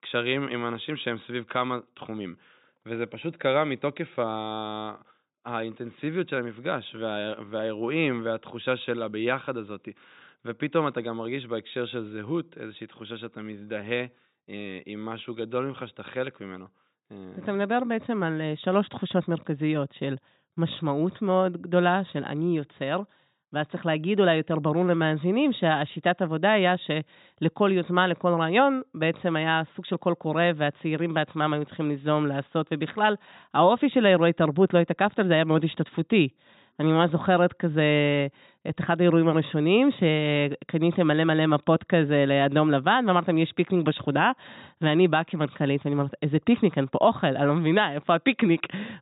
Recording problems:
high frequencies cut off; severe; nothing above 4 kHz

